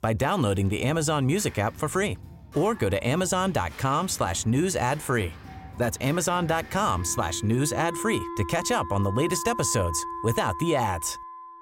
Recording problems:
background music; noticeable; throughout; 15 dB below the speech

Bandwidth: 16 kHz